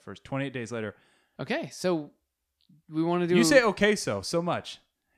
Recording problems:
none

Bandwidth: 14.5 kHz